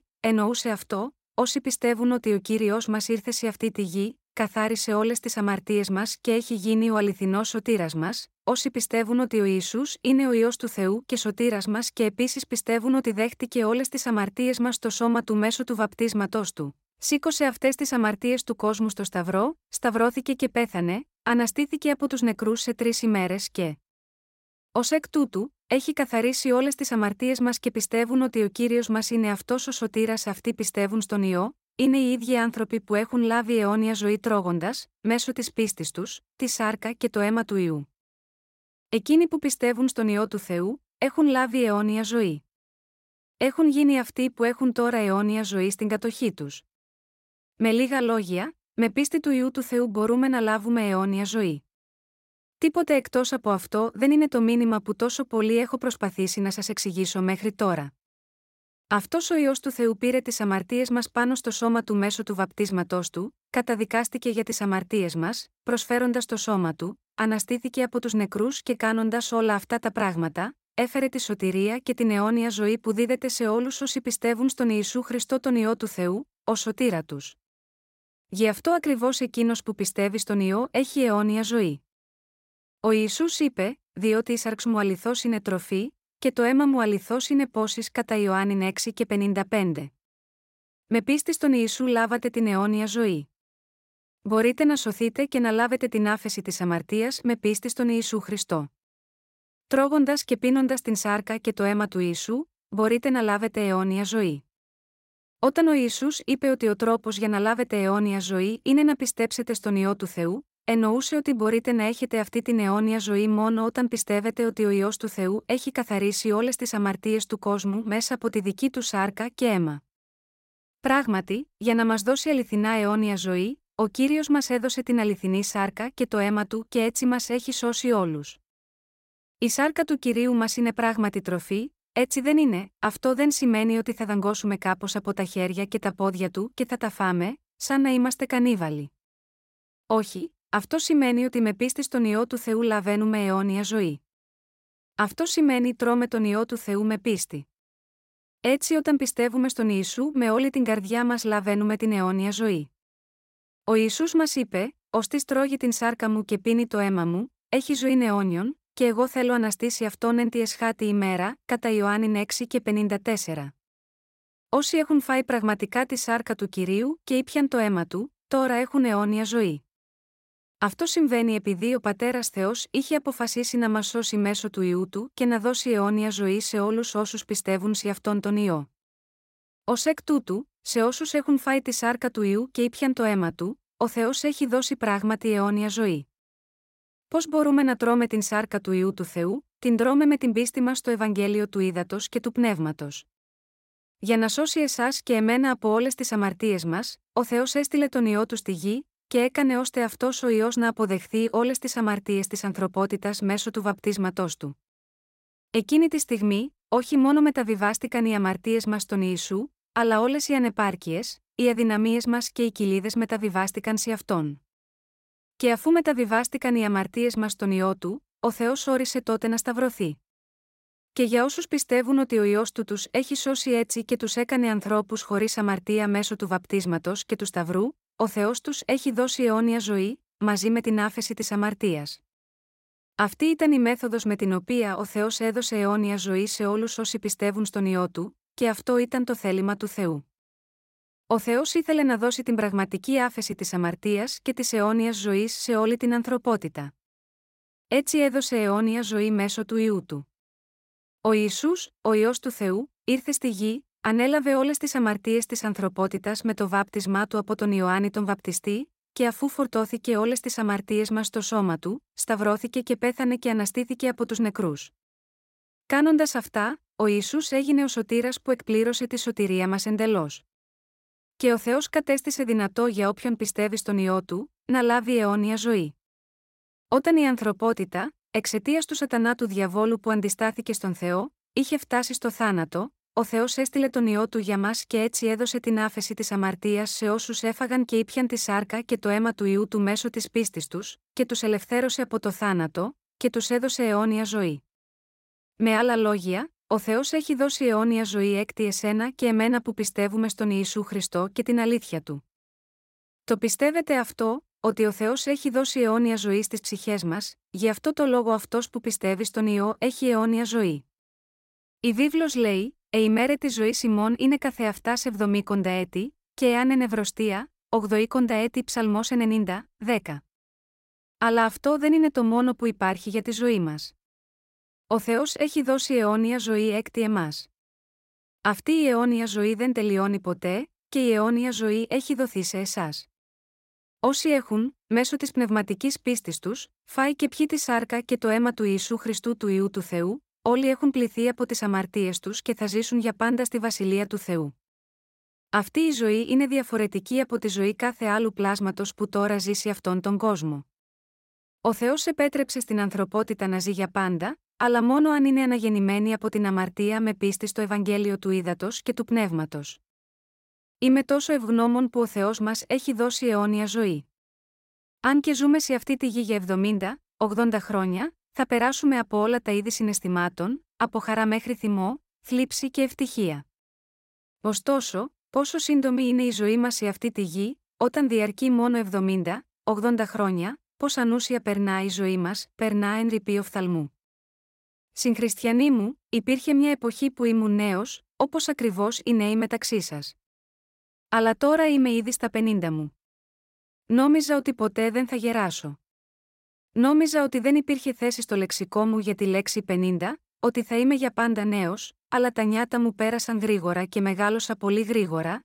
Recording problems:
none

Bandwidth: 16 kHz